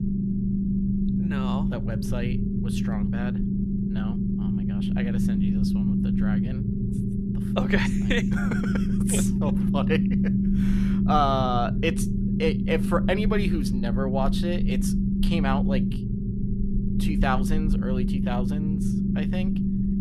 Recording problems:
low rumble; loud; throughout; 4 dB below the speech

